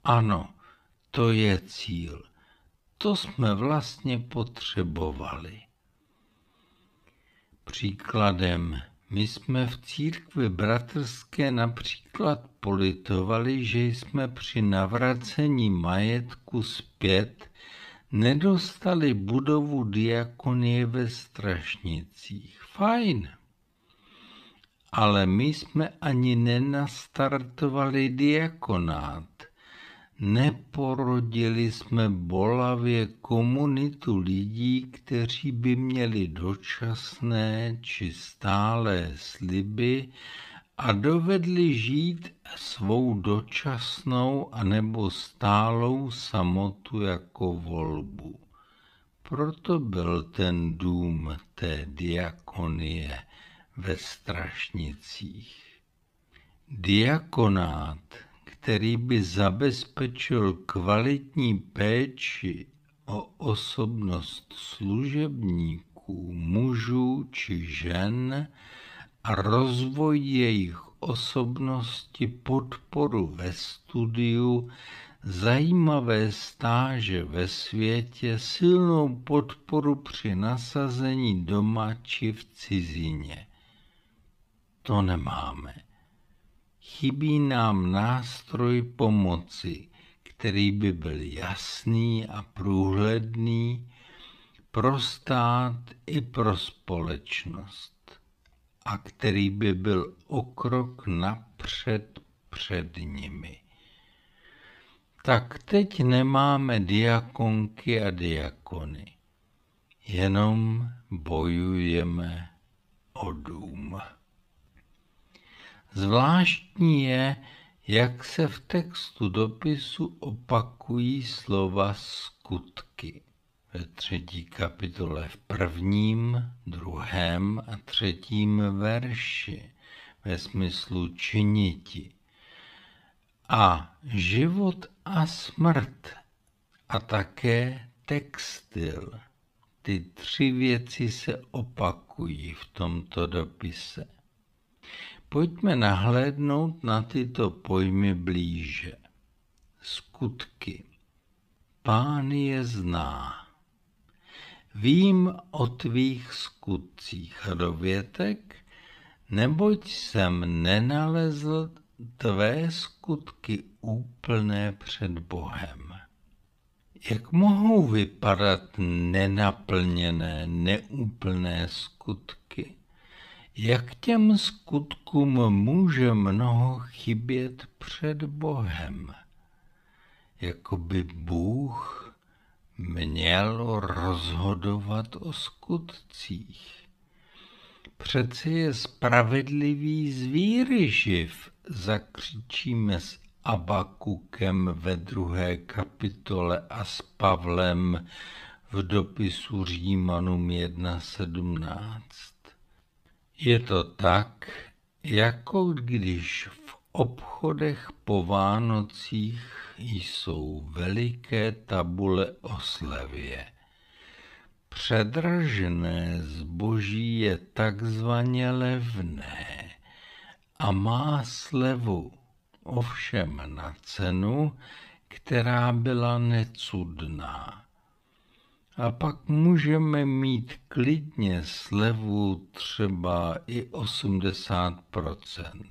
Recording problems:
wrong speed, natural pitch; too slow; 0.6 times normal speed

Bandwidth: 15 kHz